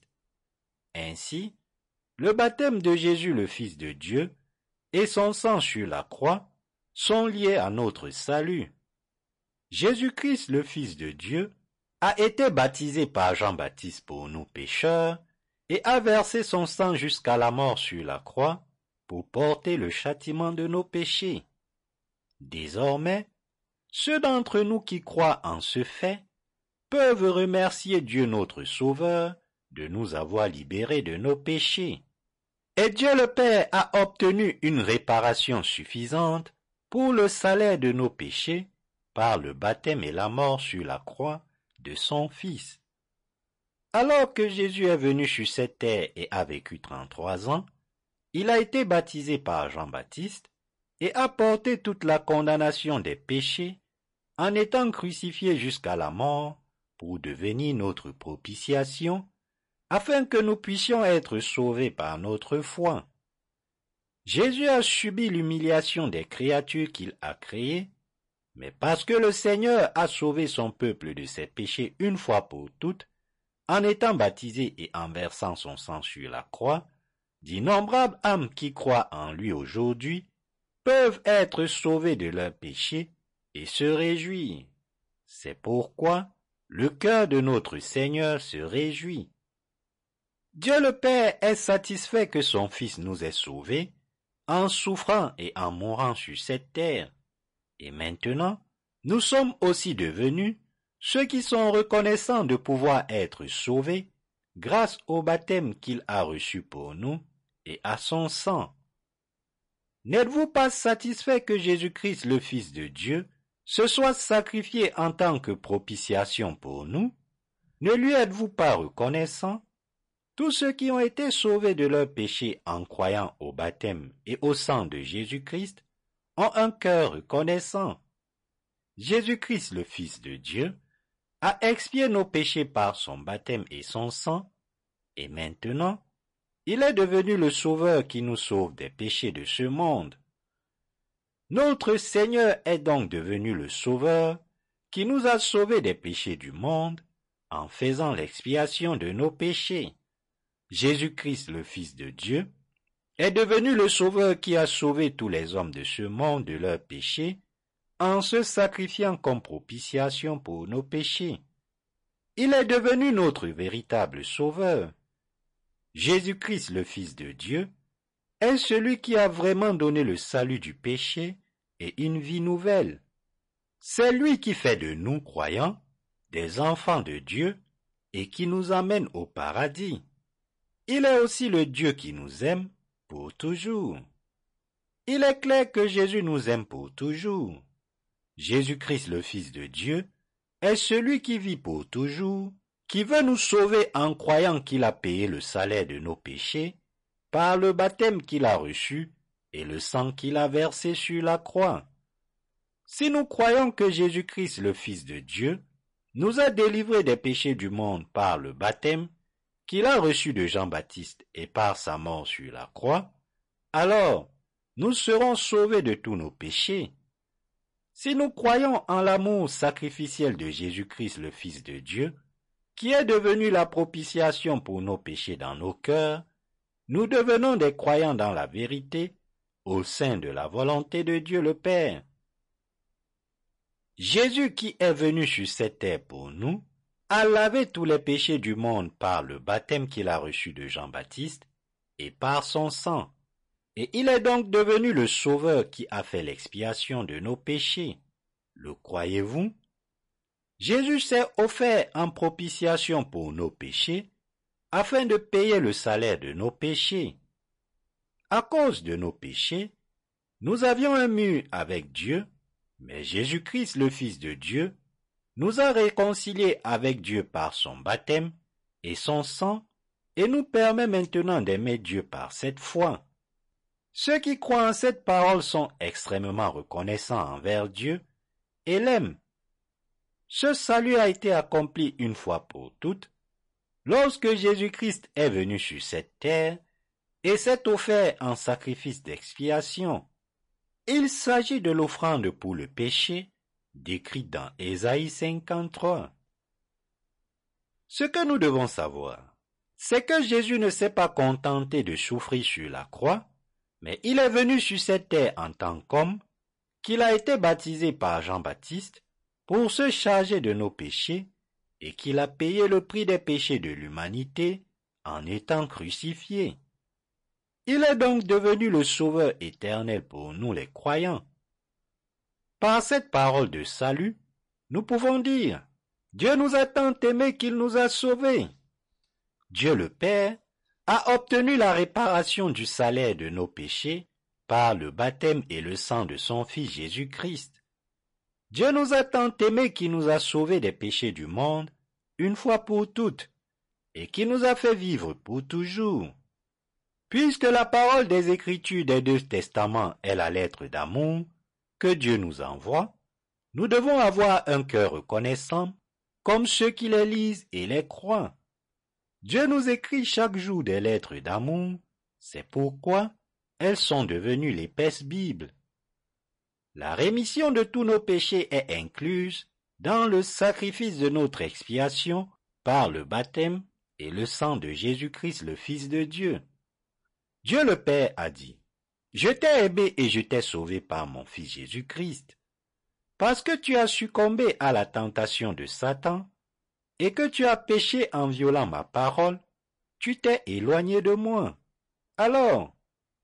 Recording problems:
distortion; slight; 4% of the sound clipped
garbled, watery; slightly; nothing above 10.5 kHz

